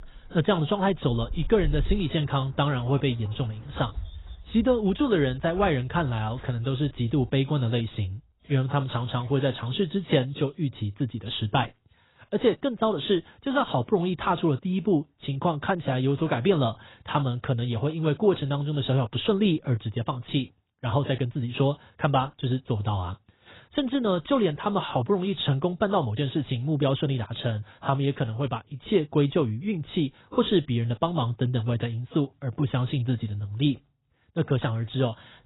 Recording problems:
garbled, watery; badly; nothing above 4 kHz
animal sounds; noticeable; until 10 s; 15 dB below the speech

